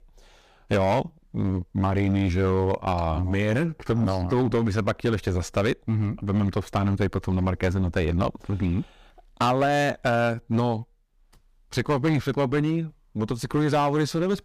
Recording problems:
distortion; slight; 7% of the sound clipped

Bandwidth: 15 kHz